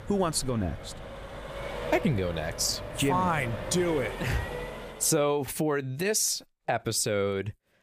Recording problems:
traffic noise; noticeable; until 5 s; 10 dB below the speech

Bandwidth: 15 kHz